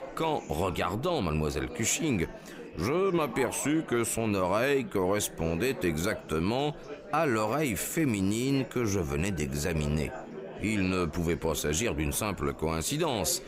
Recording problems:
chatter from many people; noticeable; throughout; 15 dB below the speech

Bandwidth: 15.5 kHz